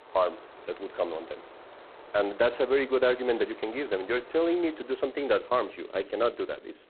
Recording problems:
phone-call audio; poor line; nothing above 4 kHz
wind in the background; faint; throughout; 20 dB below the speech

